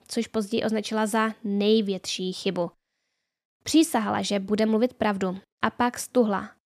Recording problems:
none

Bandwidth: 14.5 kHz